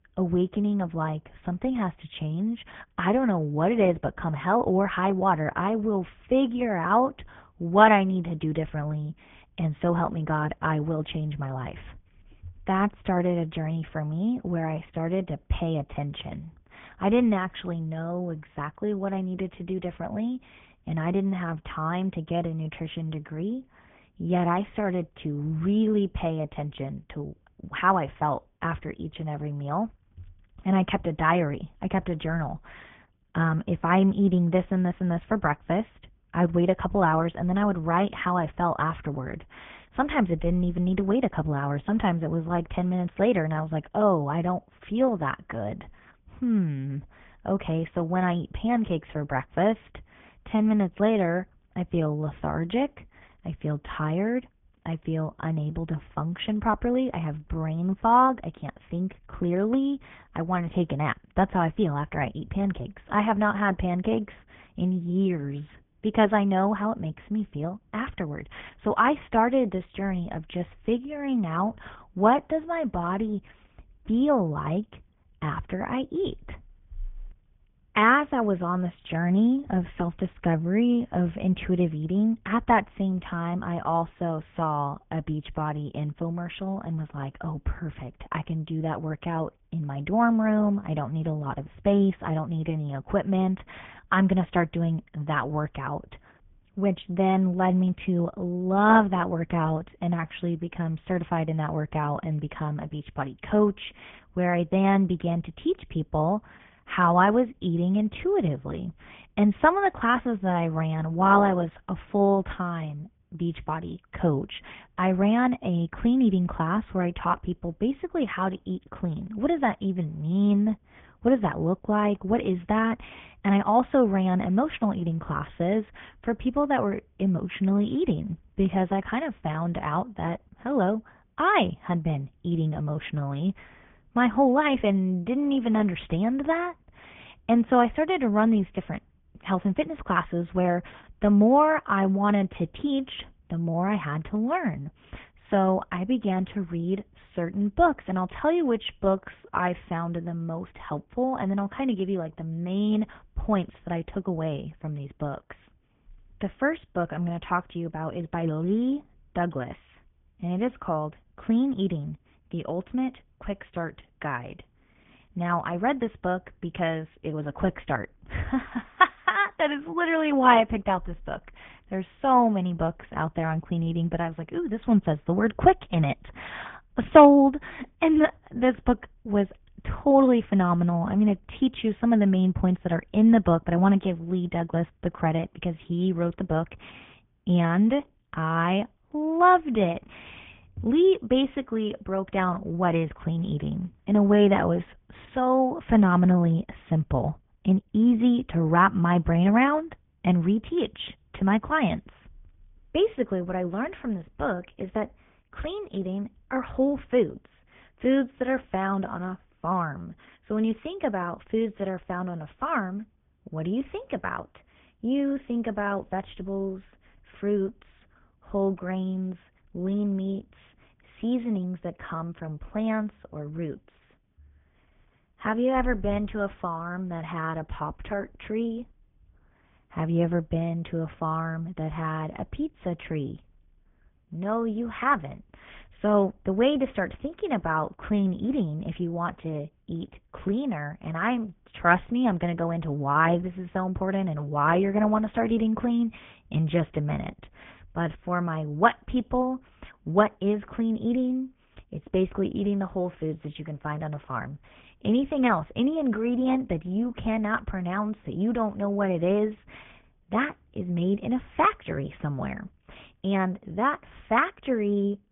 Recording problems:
garbled, watery; badly
high frequencies cut off; severe; nothing above 3.5 kHz

